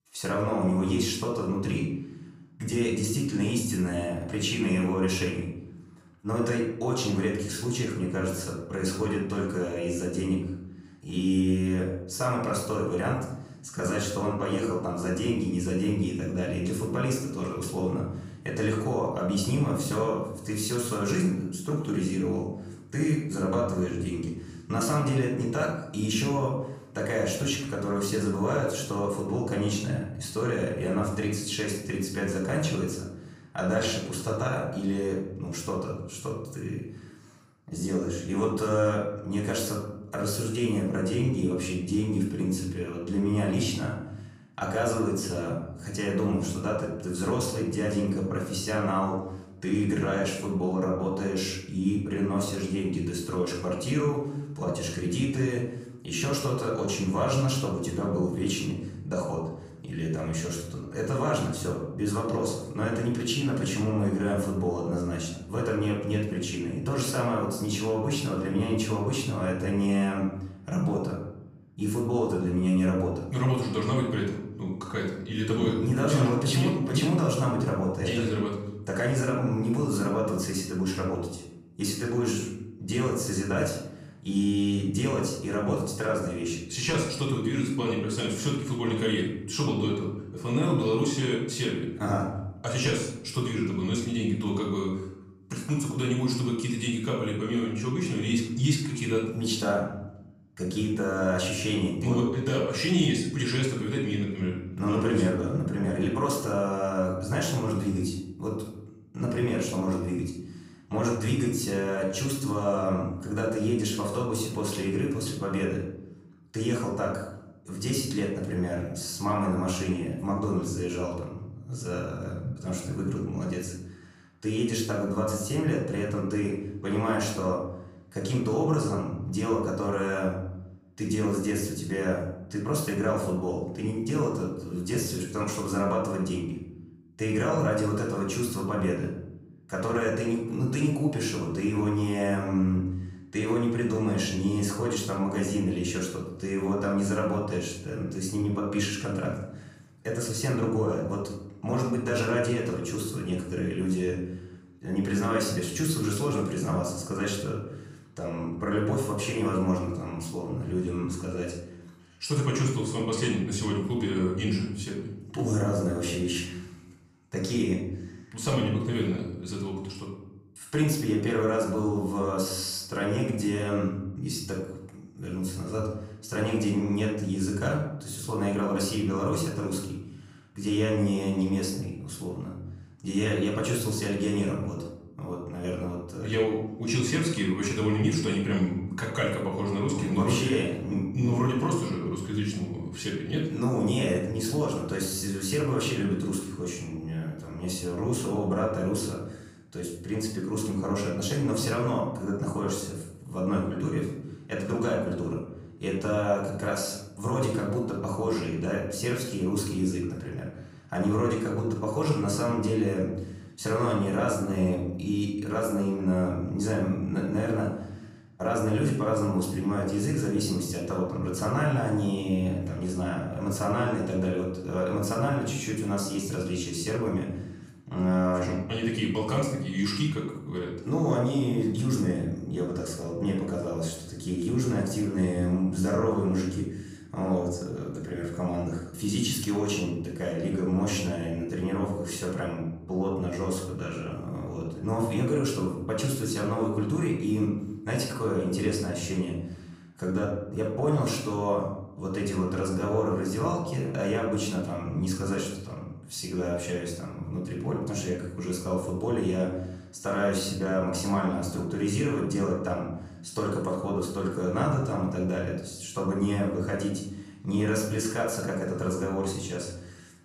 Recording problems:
off-mic speech; far
room echo; noticeable; dies away in 0.8 s

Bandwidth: 15.5 kHz